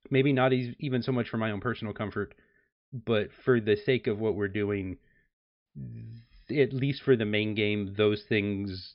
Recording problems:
high frequencies cut off; noticeable; nothing above 5.5 kHz

